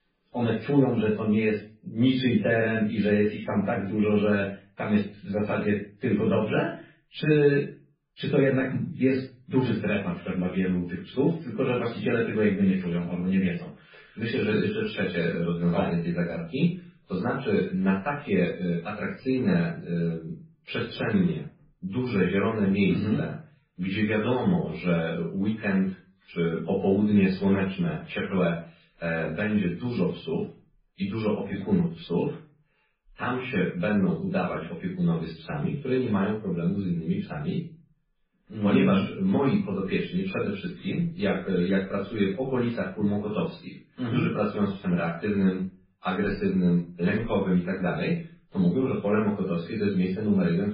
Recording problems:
off-mic speech; far
garbled, watery; badly; nothing above 5 kHz
room echo; slight; dies away in 0.3 s
muffled; very slightly; fading above 2.5 kHz

